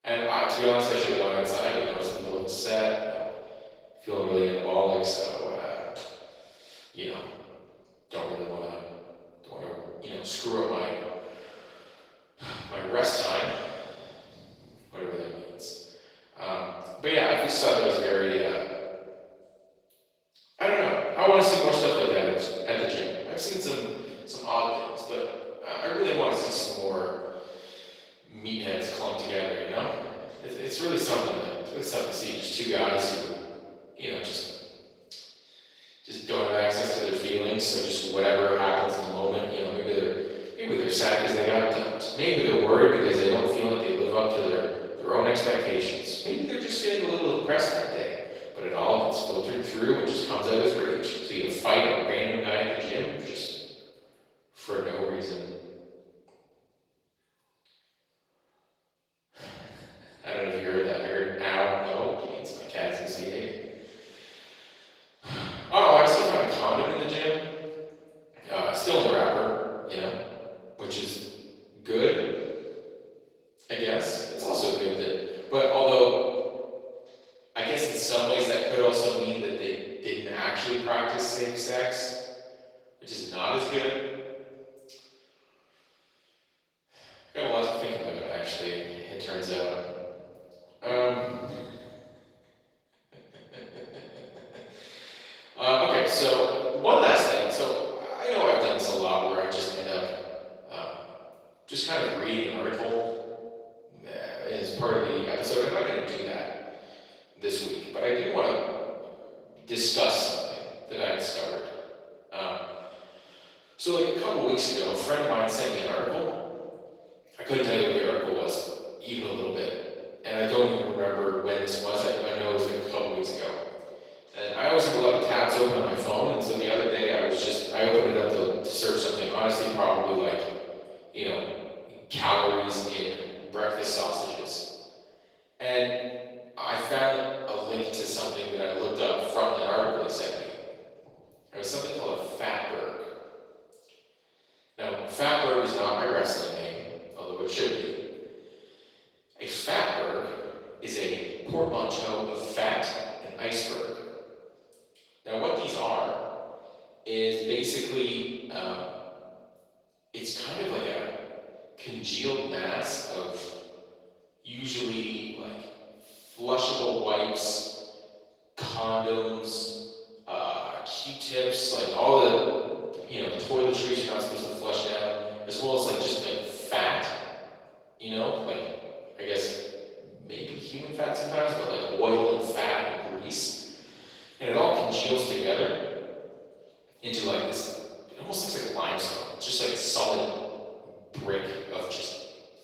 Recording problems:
room echo; strong; dies away in 1.5 s
off-mic speech; far
thin; somewhat; fading below 450 Hz
garbled, watery; slightly; nothing above 18.5 kHz

